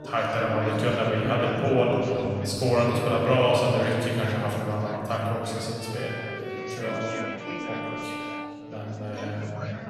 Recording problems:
room echo; strong; dies away in 2.7 s
off-mic speech; far
background music; noticeable; throughout; 10 dB below the speech
chatter from many people; noticeable; throughout; 15 dB below the speech

